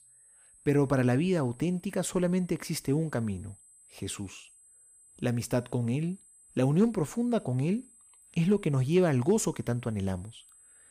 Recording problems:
high-pitched whine; faint; throughout; 8 kHz, 25 dB below the speech

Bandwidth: 15 kHz